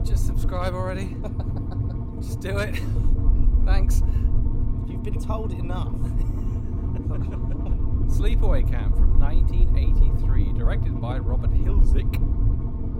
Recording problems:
low rumble; loud; throughout; 3 dB below the speech

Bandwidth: 16 kHz